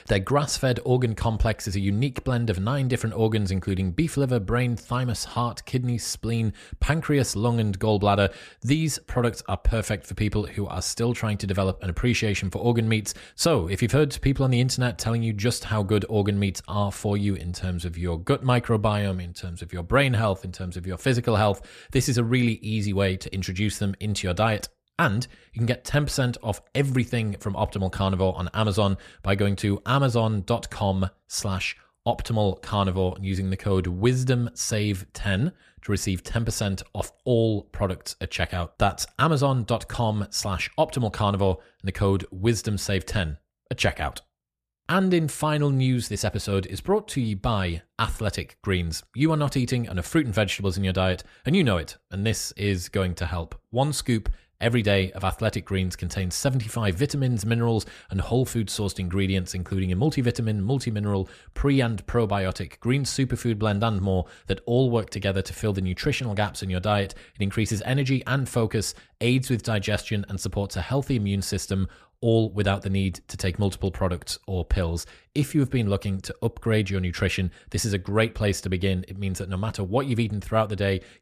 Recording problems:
none

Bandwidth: 14.5 kHz